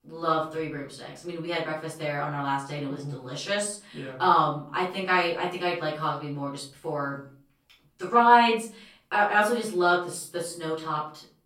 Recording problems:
off-mic speech; far
room echo; slight; dies away in 0.4 s

